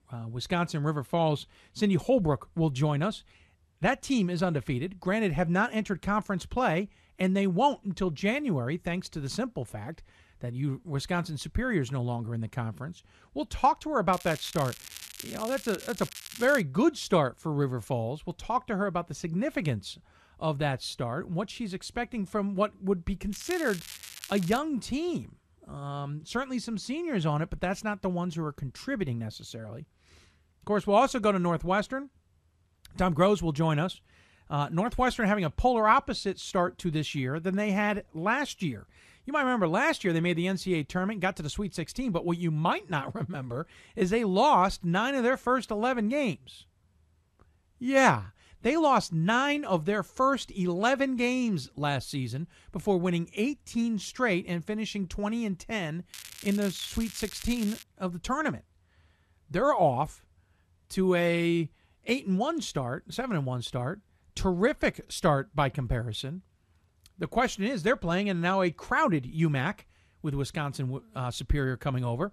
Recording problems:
crackling; noticeable; from 14 to 17 s, from 23 to 25 s and from 56 to 58 s; 15 dB below the speech

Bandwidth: 13.5 kHz